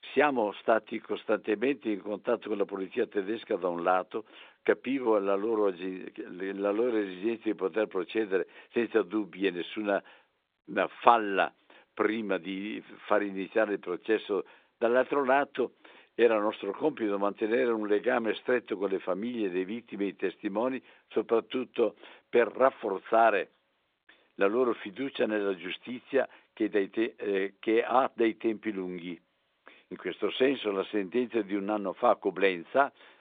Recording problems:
phone-call audio; nothing above 3.5 kHz

